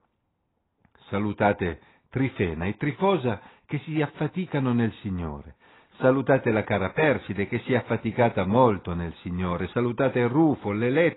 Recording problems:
garbled, watery; badly; nothing above 4 kHz
muffled; very slightly; fading above 3.5 kHz

